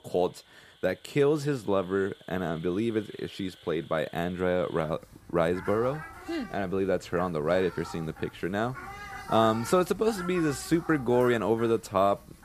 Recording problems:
animal sounds; noticeable; throughout; 15 dB below the speech

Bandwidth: 14.5 kHz